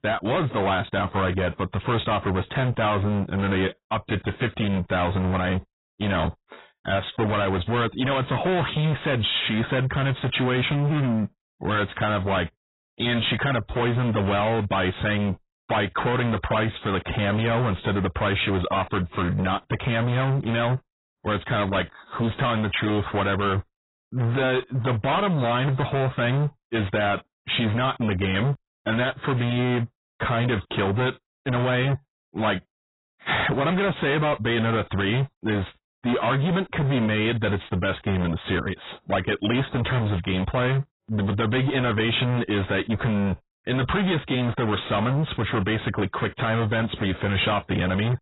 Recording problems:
distortion; heavy; 28% of the sound clipped
garbled, watery; badly; nothing above 4 kHz

